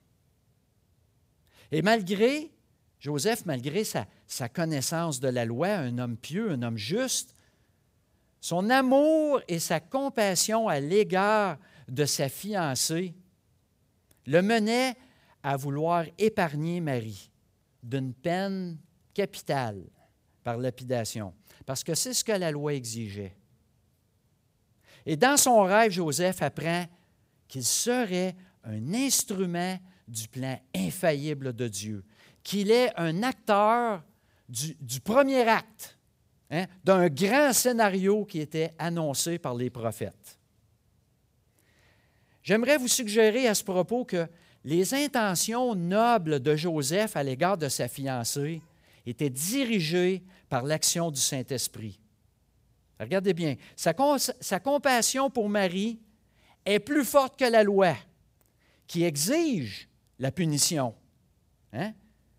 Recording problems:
none

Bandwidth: 15.5 kHz